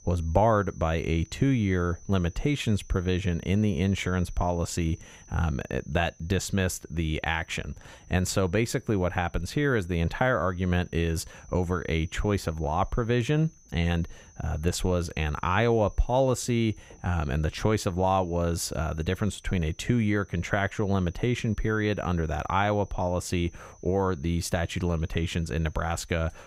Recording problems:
high-pitched whine; faint; throughout; 6 kHz, 30 dB below the speech

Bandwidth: 15.5 kHz